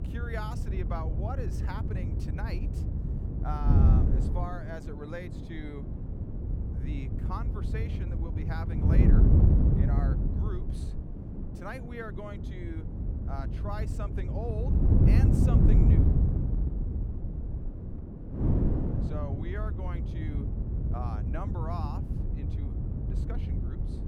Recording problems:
wind noise on the microphone; heavy; 1 dB above the speech

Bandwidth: 18 kHz